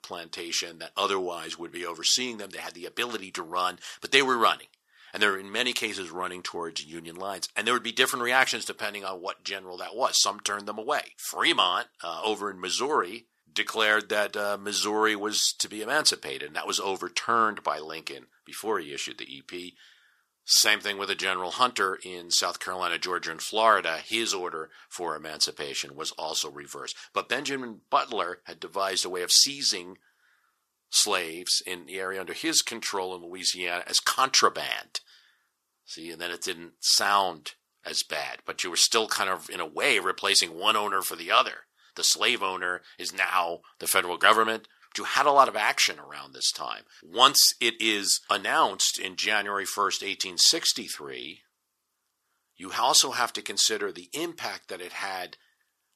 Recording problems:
thin; very; fading below 650 Hz

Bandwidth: 14.5 kHz